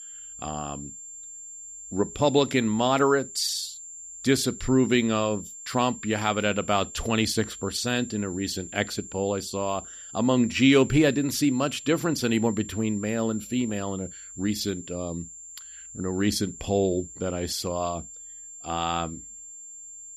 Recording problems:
high-pitched whine; noticeable; throughout; 7.5 kHz, 15 dB below the speech

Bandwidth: 15 kHz